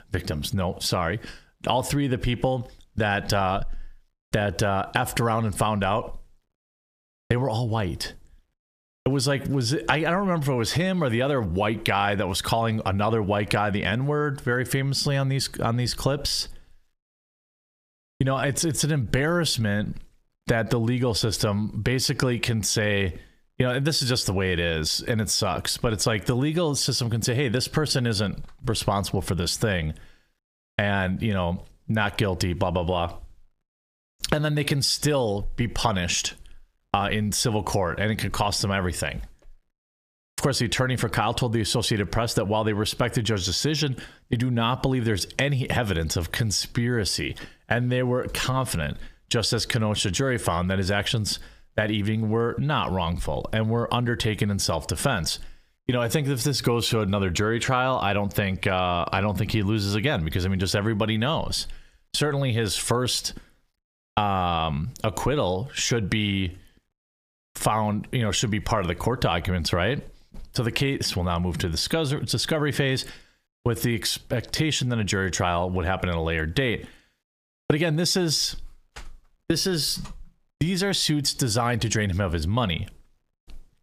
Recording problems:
squashed, flat; heavily

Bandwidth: 15 kHz